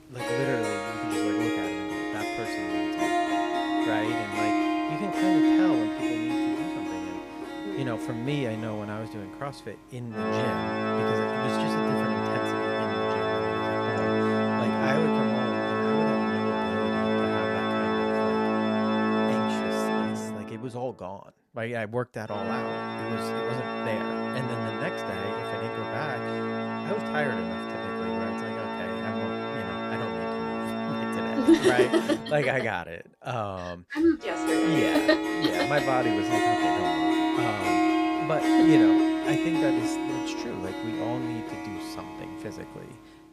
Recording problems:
background music; very loud; throughout; 5 dB above the speech

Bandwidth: 15 kHz